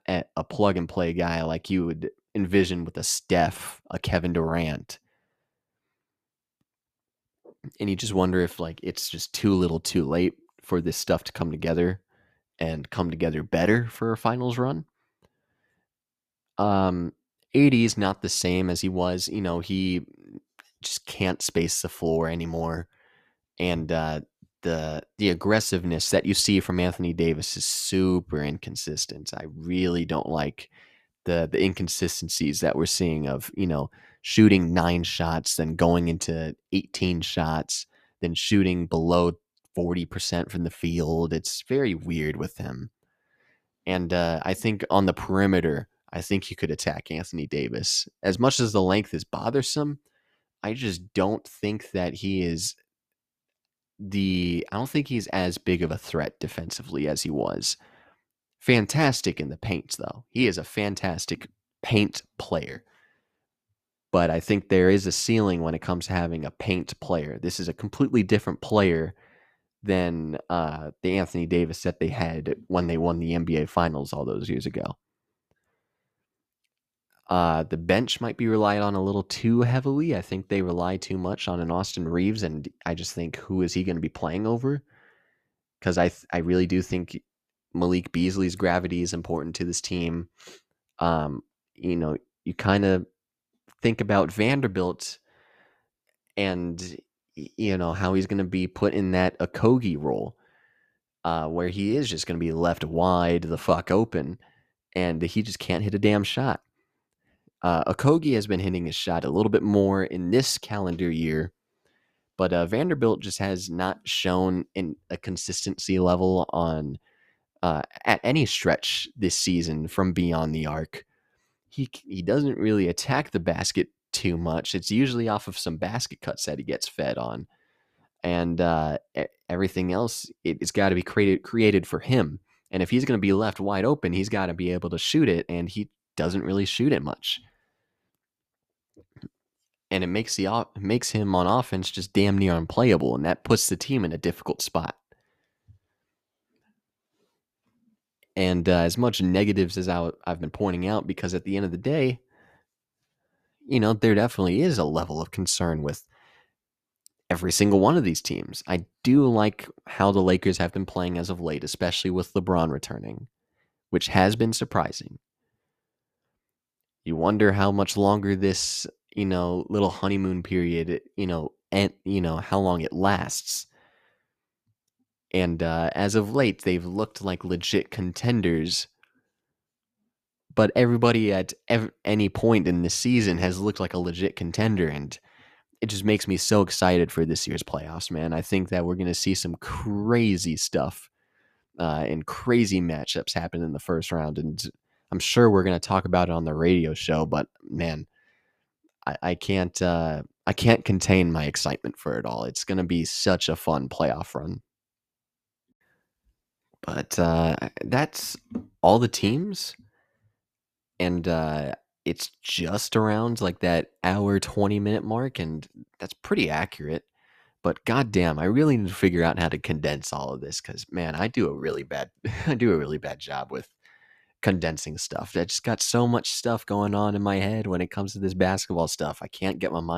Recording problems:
abrupt cut into speech; at the end

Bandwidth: 14.5 kHz